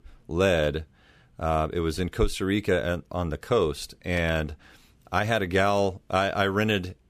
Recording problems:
none

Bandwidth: 15 kHz